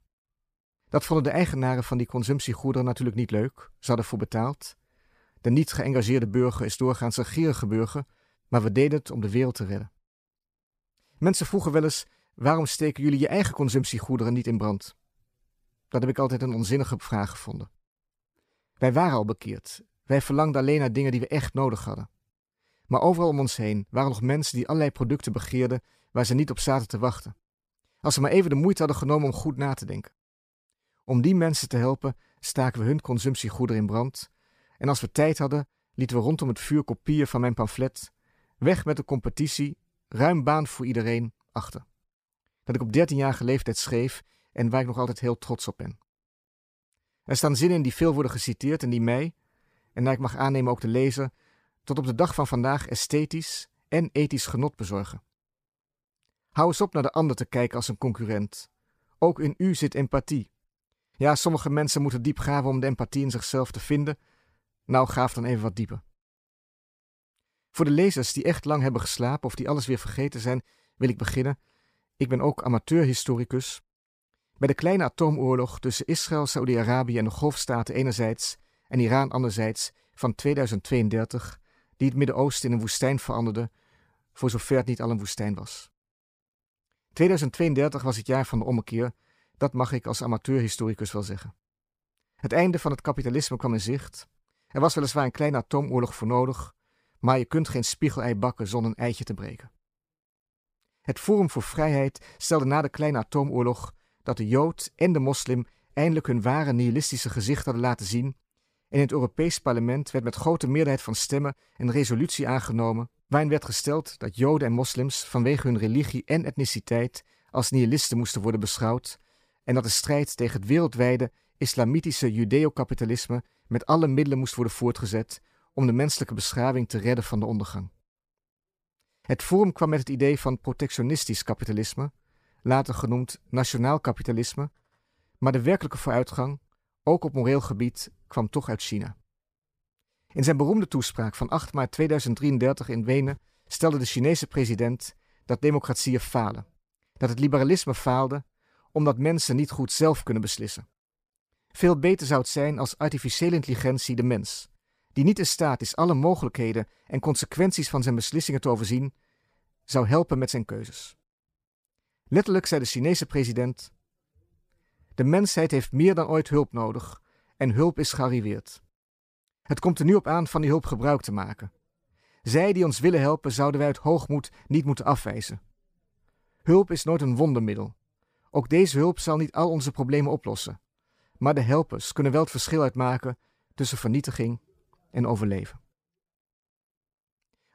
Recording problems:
none

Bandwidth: 15 kHz